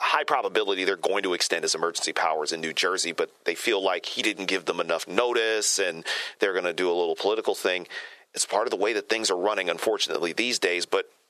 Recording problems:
thin; very; fading below 400 Hz
squashed, flat; heavily

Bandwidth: 13.5 kHz